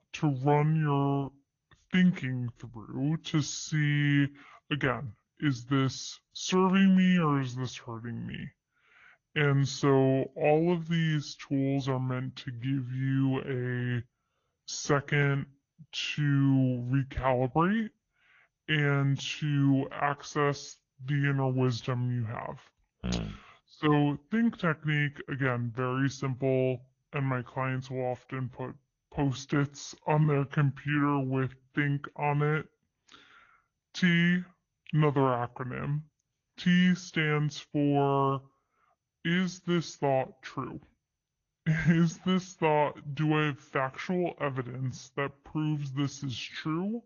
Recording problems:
wrong speed and pitch; too slow and too low; 0.7 times normal speed
garbled, watery; slightly; nothing above 6.5 kHz

